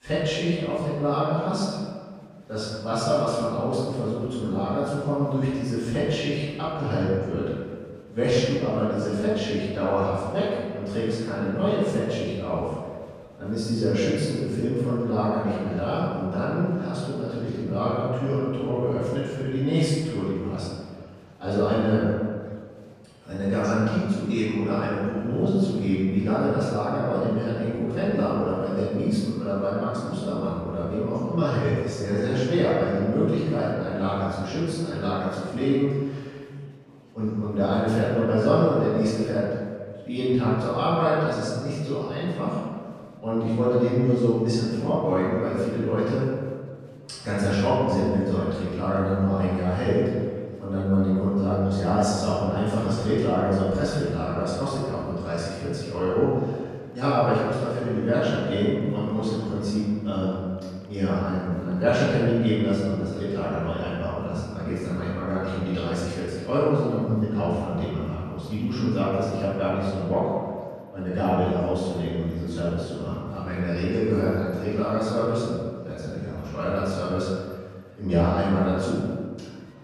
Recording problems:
room echo; strong; dies away in 1.6 s
off-mic speech; far
murmuring crowd; faint; throughout; 30 dB below the speech

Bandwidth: 14.5 kHz